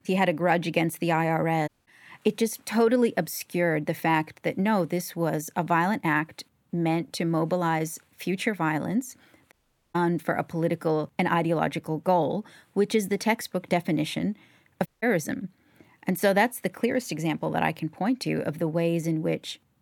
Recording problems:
audio cutting out; at 1.5 s, at 9.5 s and at 15 s

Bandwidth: 18.5 kHz